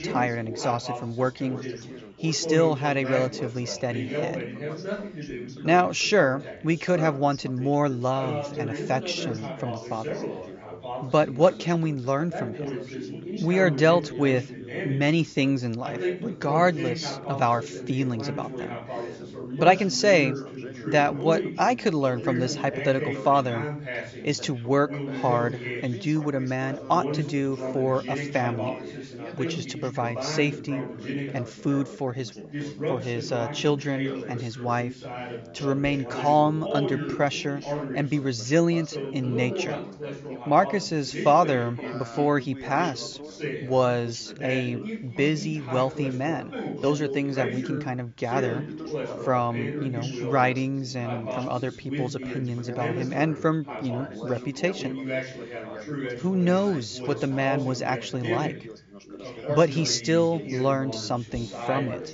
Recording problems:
high frequencies cut off; noticeable; nothing above 7.5 kHz
background chatter; loud; throughout; 3 voices, 8 dB below the speech

